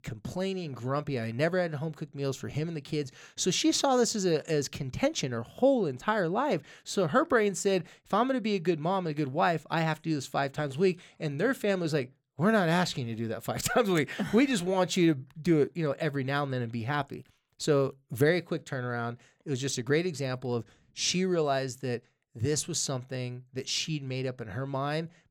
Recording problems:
none

